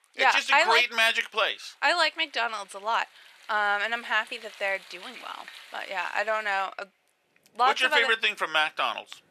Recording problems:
thin; very; fading below 650 Hz
rain or running water; faint; throughout; 25 dB below the speech

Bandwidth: 13.5 kHz